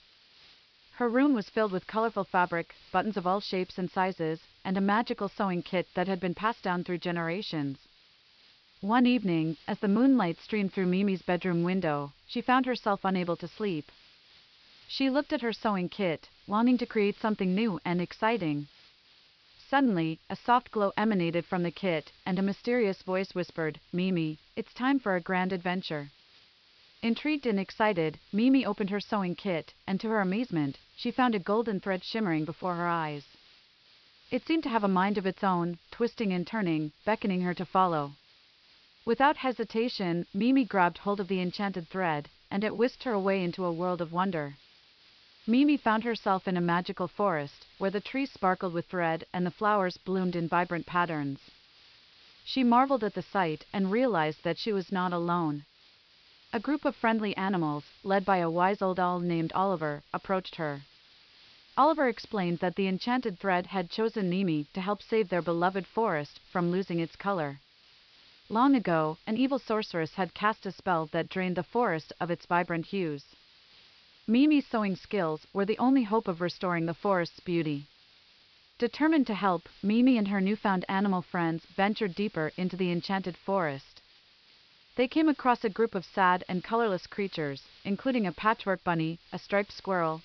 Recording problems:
high frequencies cut off; noticeable; nothing above 5.5 kHz
hiss; faint; throughout; 25 dB below the speech

